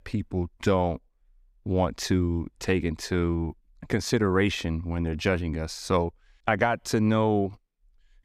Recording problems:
none

